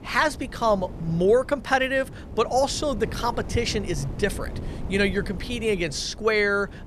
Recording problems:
wind noise on the microphone; occasional gusts; 20 dB below the speech

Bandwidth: 14 kHz